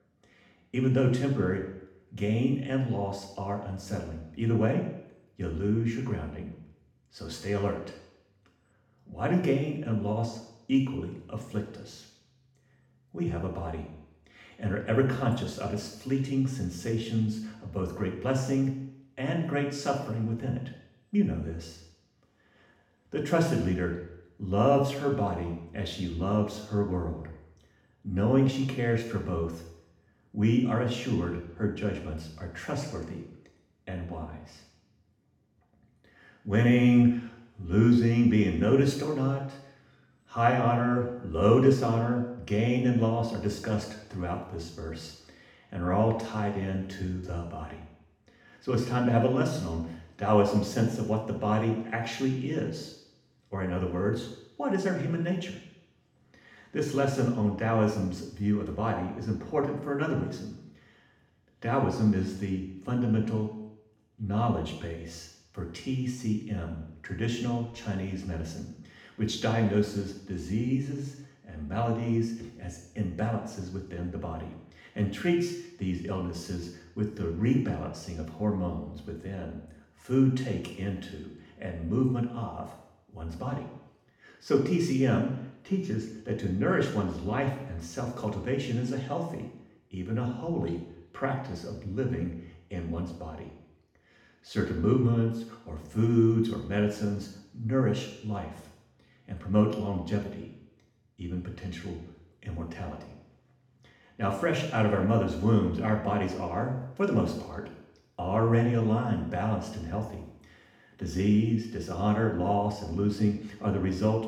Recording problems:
off-mic speech; far
room echo; noticeable; dies away in 0.8 s

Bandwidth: 17 kHz